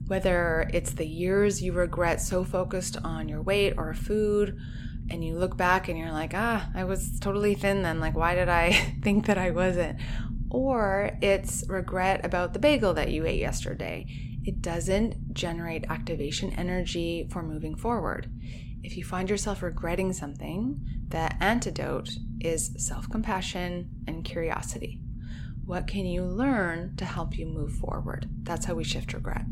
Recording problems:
low rumble; noticeable; throughout; 20 dB below the speech

